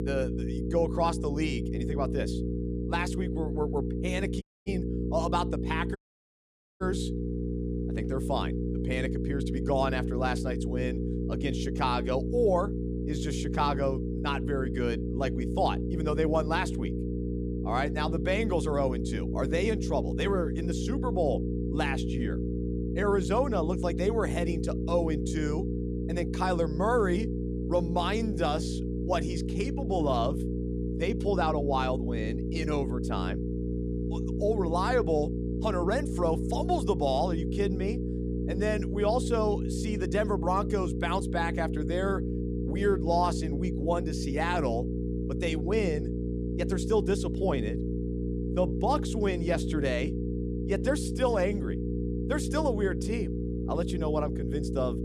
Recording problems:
electrical hum; loud; throughout; 60 Hz, 7 dB below the speech
audio cutting out; at 4.5 s and at 6 s for 1 s

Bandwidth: 15 kHz